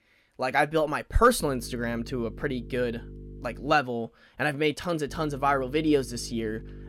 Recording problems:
electrical hum; faint; from 1.5 to 3.5 s and from 5 s on; 50 Hz, 25 dB below the speech

